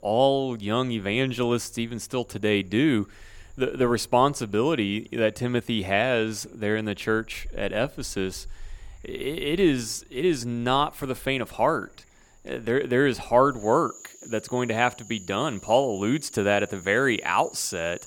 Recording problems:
animal sounds; faint; throughout; 25 dB below the speech

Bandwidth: 17.5 kHz